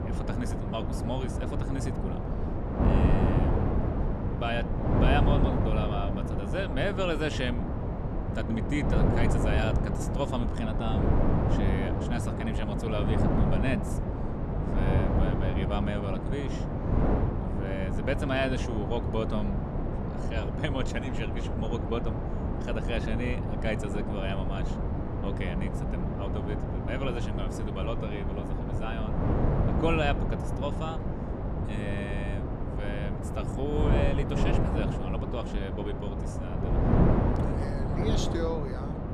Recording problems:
wind noise on the microphone; heavy; as loud as the speech

